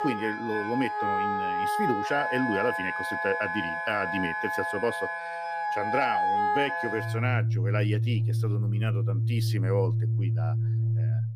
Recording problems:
background music; very loud; throughout; 4 dB above the speech

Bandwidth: 15 kHz